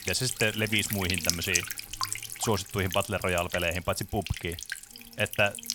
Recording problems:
electrical hum; loud; throughout; 50 Hz, 6 dB below the speech

